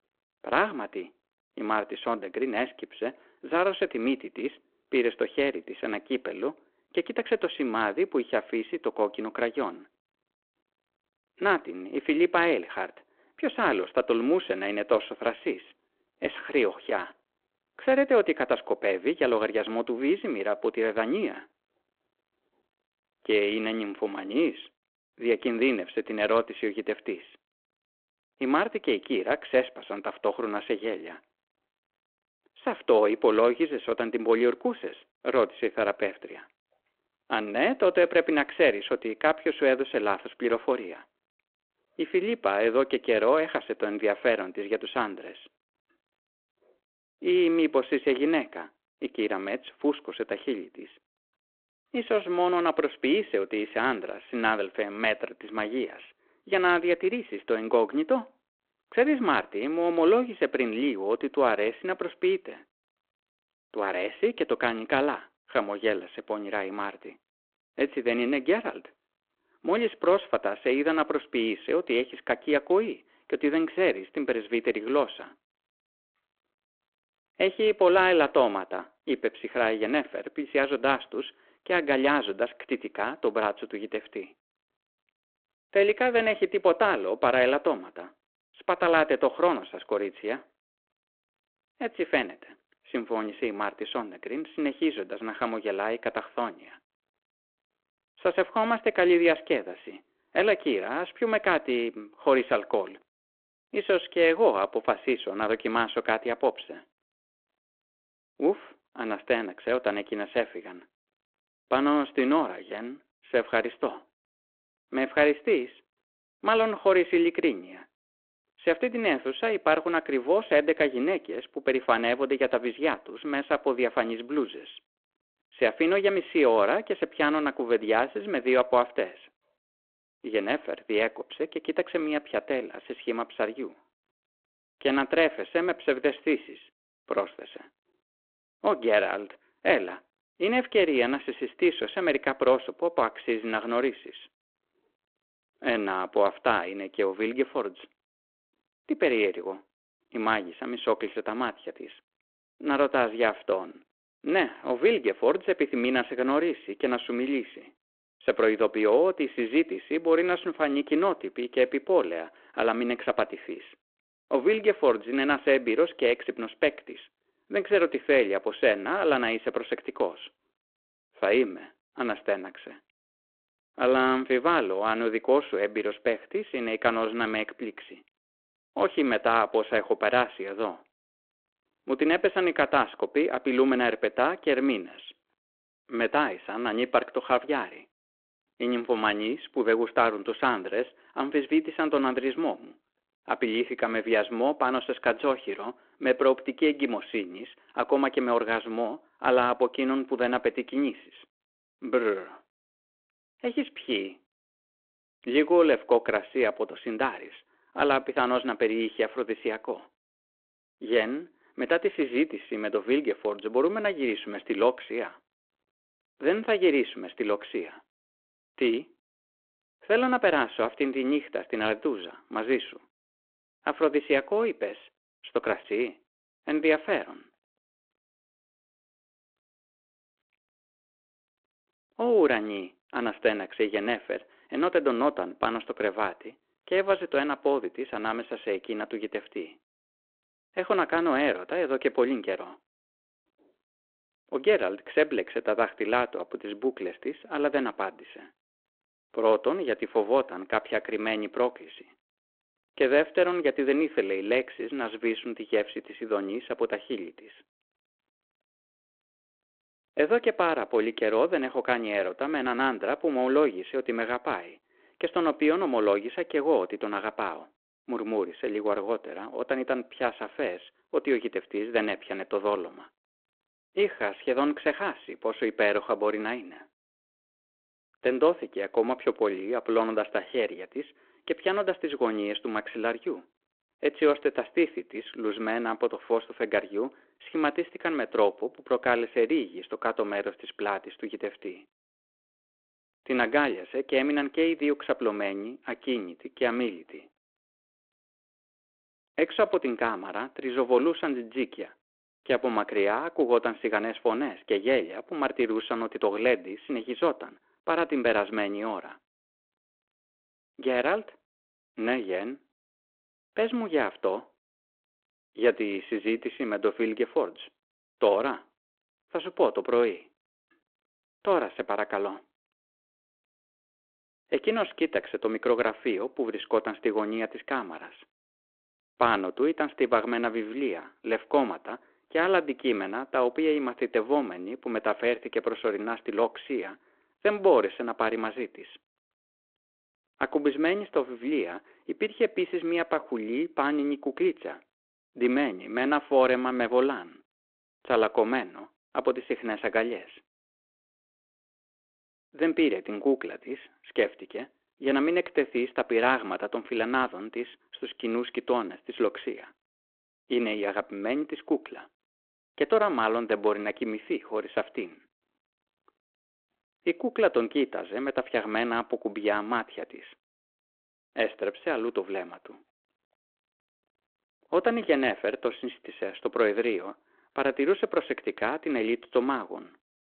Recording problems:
phone-call audio

